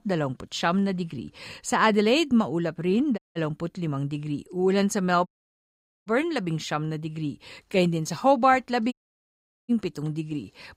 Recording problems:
audio cutting out; at 3 s, at 5.5 s for 1 s and at 9 s for 1 s

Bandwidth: 15.5 kHz